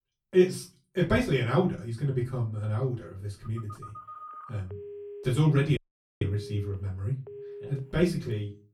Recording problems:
off-mic speech; far
room echo; very slight; dies away in 0.3 s
phone ringing; faint; from 3.5 s on; peak 15 dB below the speech
audio cutting out; at 6 s

